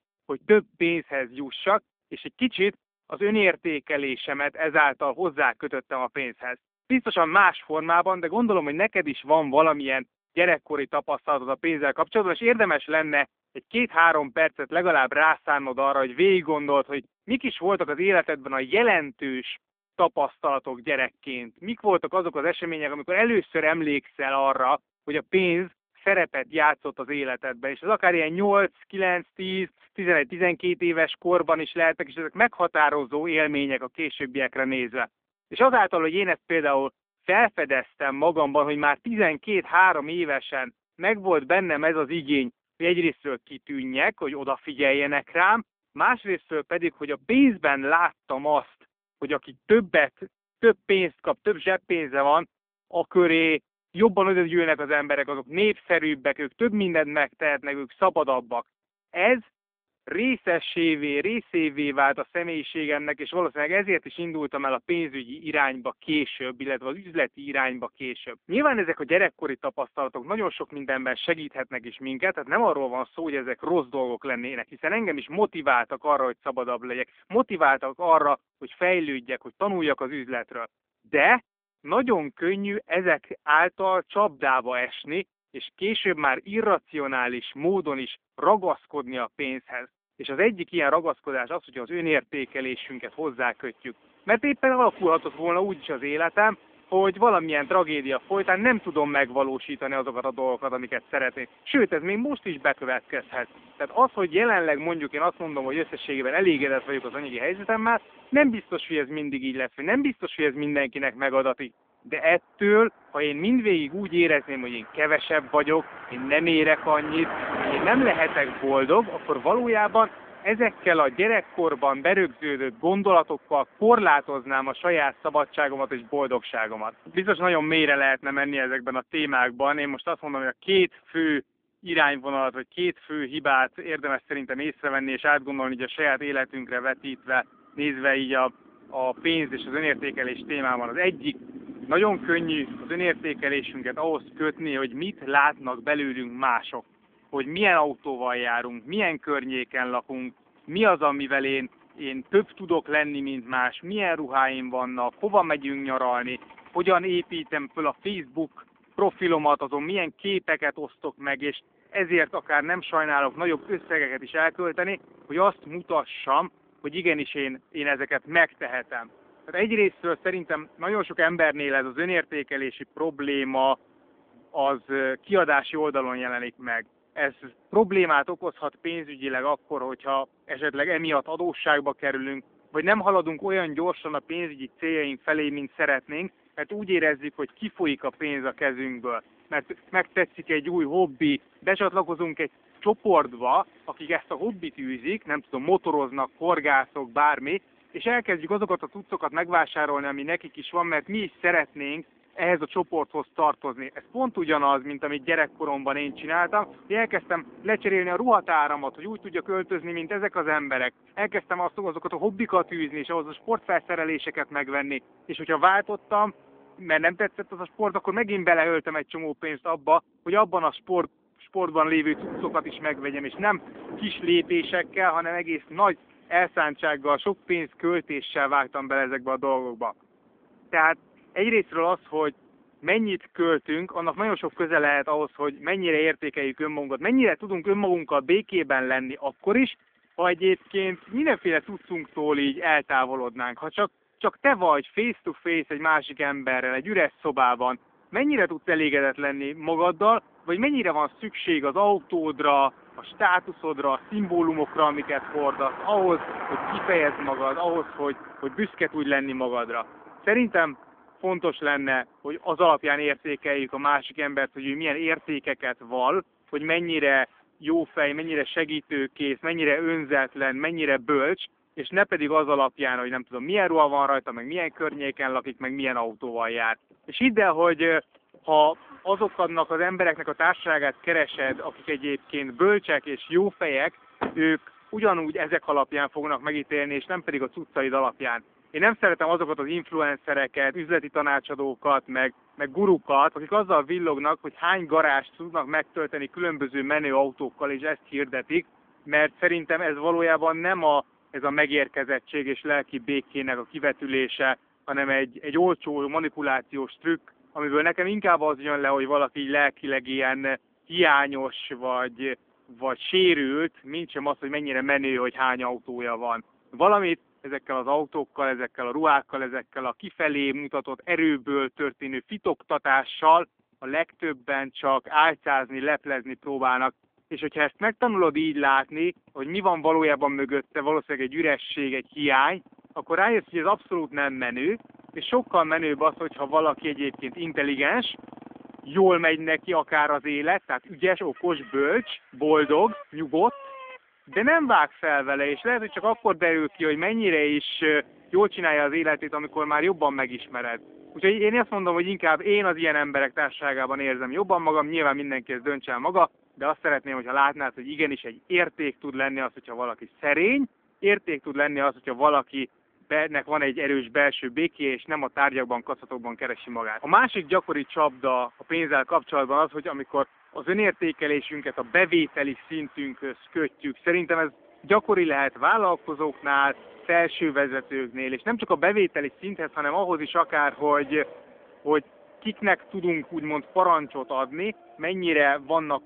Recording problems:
phone-call audio; nothing above 3.5 kHz
traffic noise; noticeable; from 1:33 on; 20 dB below the speech

